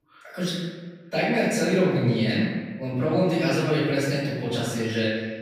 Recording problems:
room echo; strong; dies away in 1.3 s
off-mic speech; far

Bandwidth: 15.5 kHz